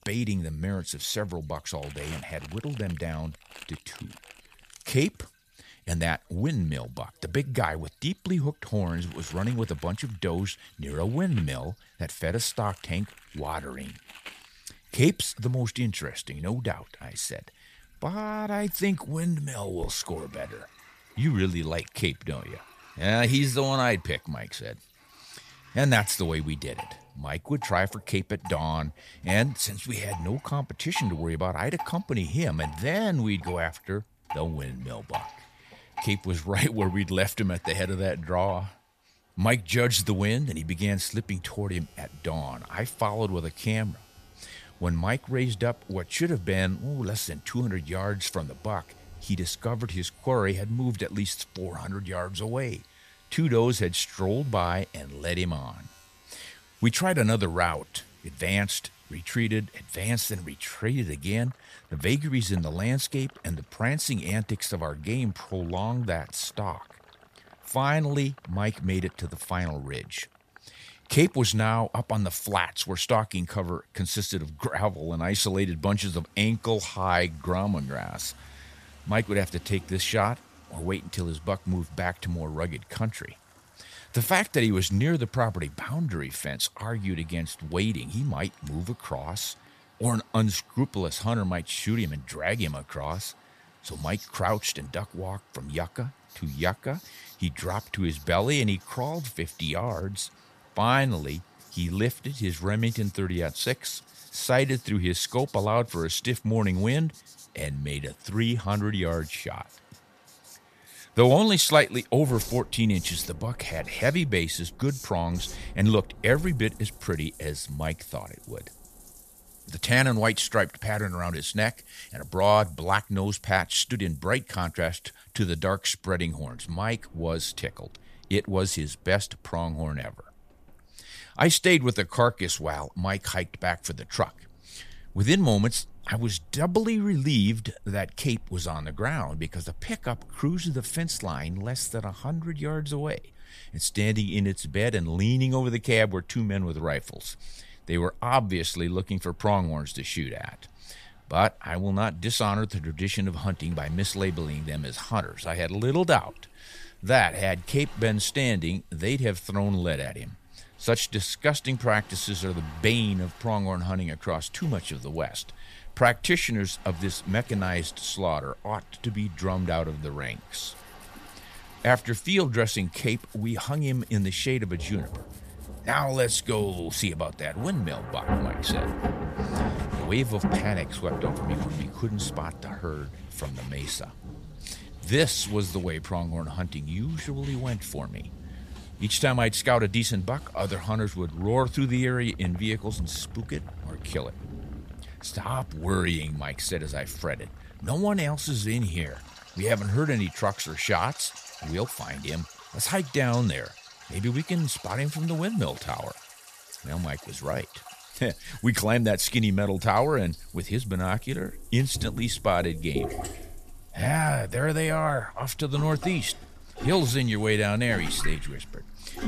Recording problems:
rain or running water; noticeable; throughout; 15 dB below the speech
household noises; faint; throughout; 25 dB below the speech

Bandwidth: 14.5 kHz